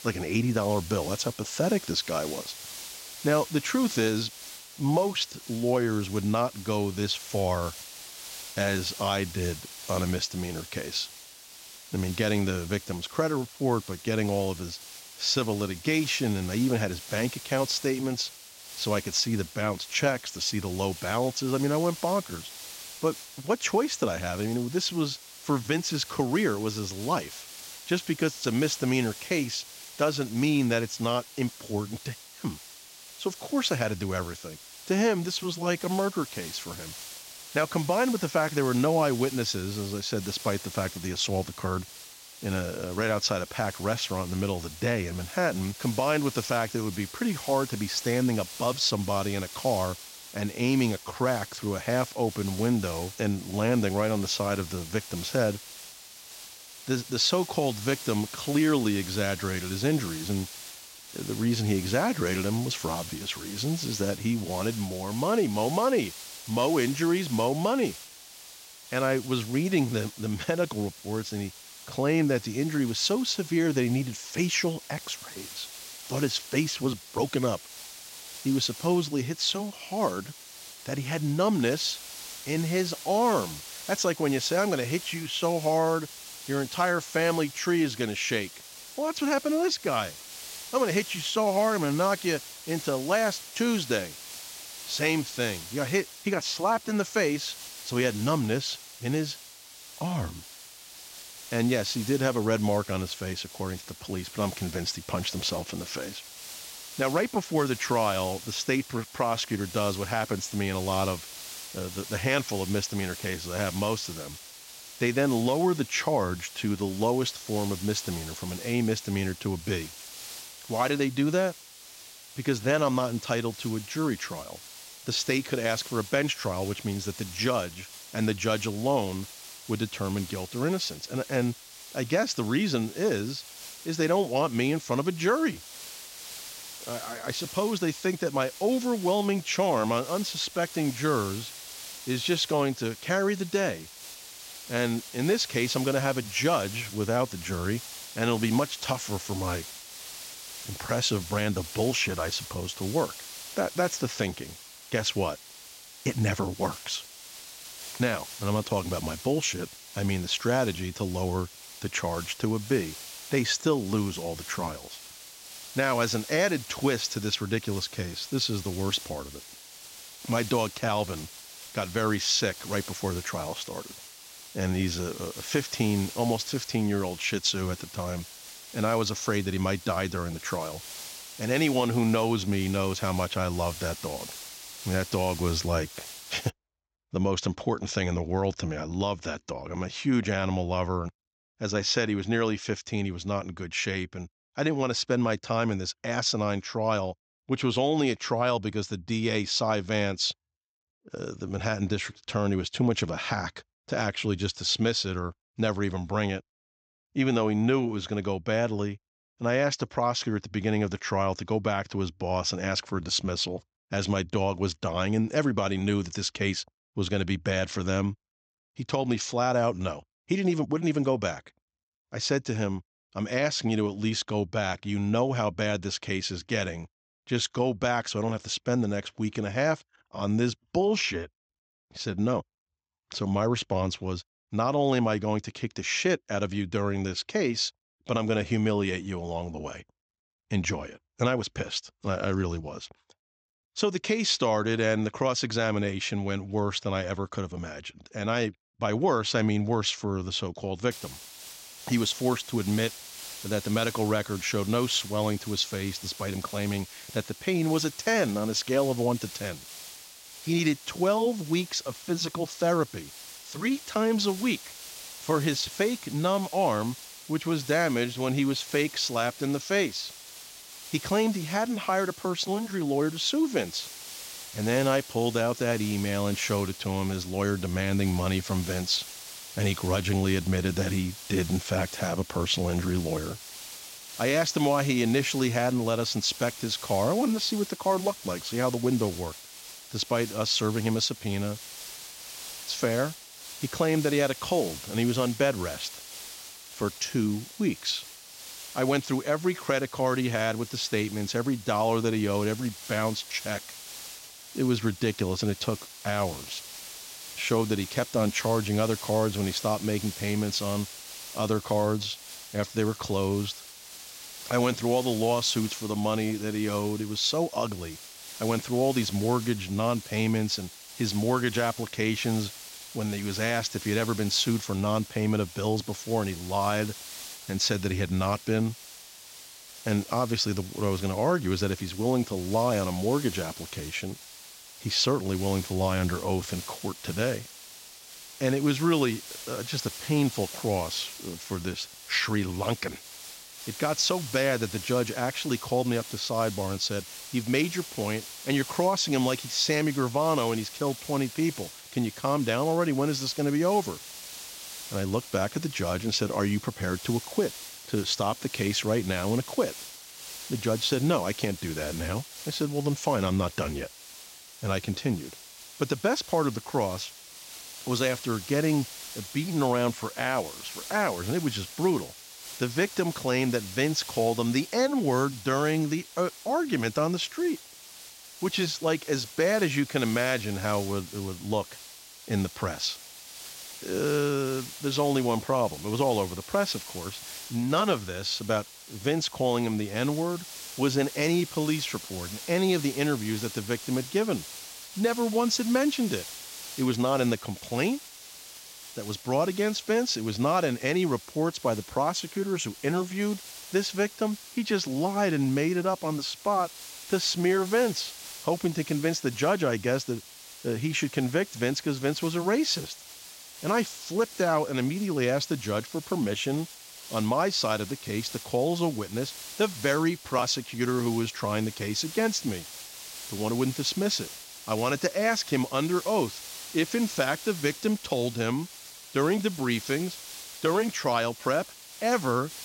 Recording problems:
high frequencies cut off; noticeable; nothing above 8 kHz
hiss; noticeable; until 3:07 and from 4:11 on; 15 dB below the speech

